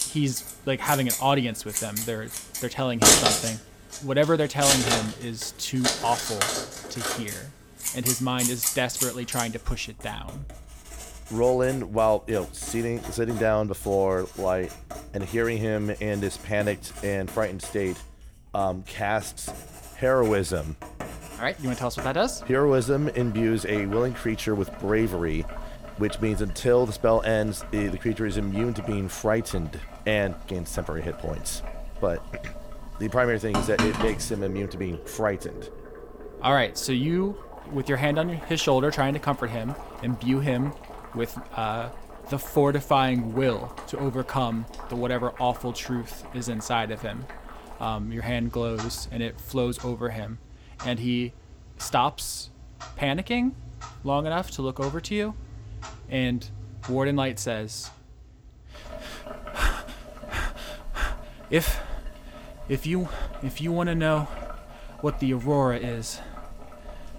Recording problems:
household noises; loud; throughout; 5 dB below the speech

